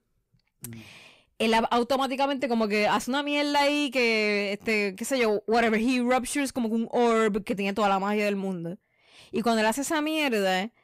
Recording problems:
distortion; slight; 10 dB below the speech

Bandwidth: 15.5 kHz